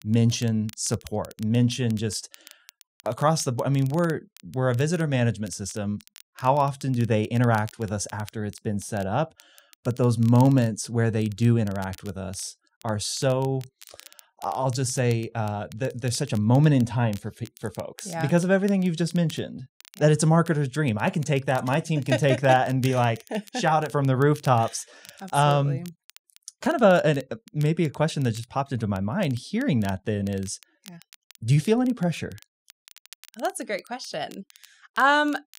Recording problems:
crackle, like an old record; faint; 25 dB below the speech

